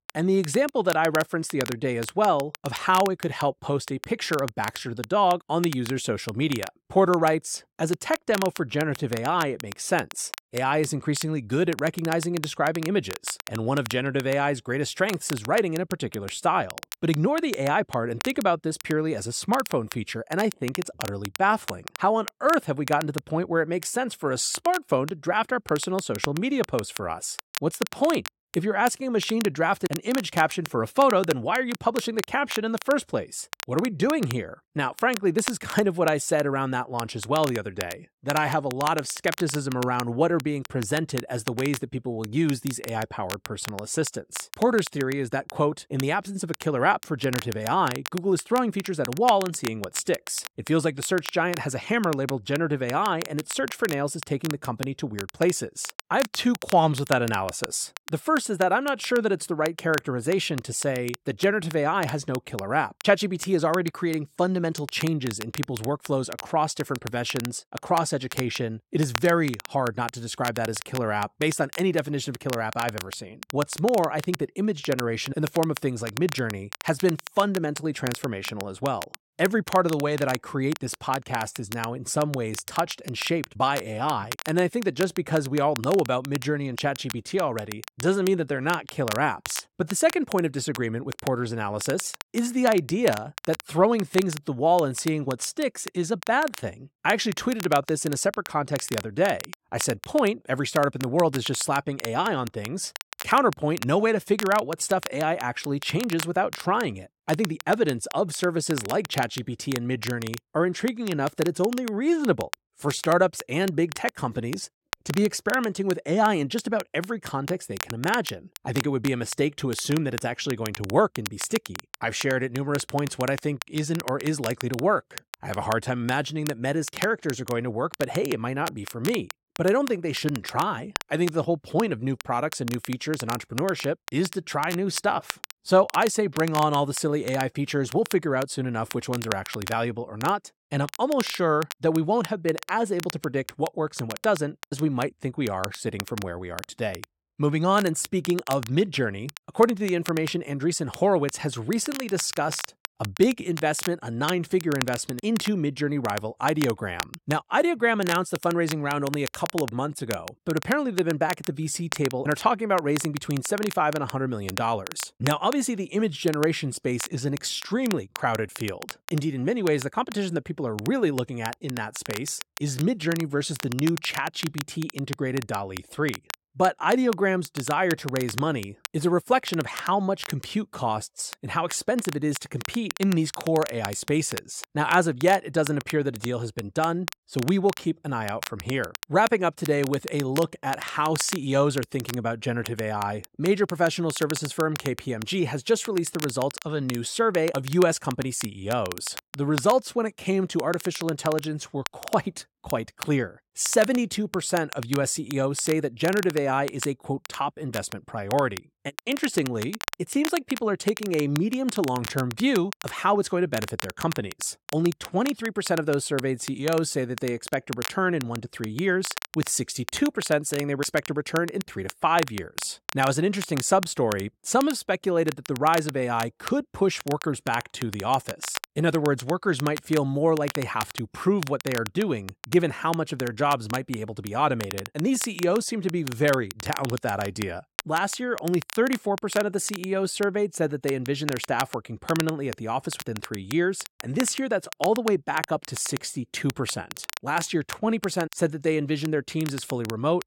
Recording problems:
crackle, like an old record; noticeable; 10 dB below the speech

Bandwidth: 16.5 kHz